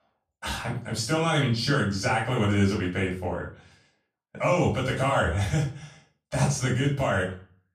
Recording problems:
off-mic speech; far
room echo; slight; dies away in 0.3 s

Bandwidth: 14.5 kHz